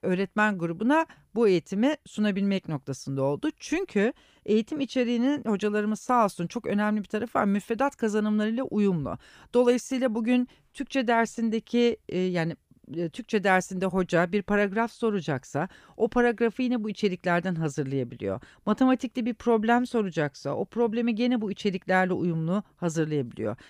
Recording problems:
none

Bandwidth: 15 kHz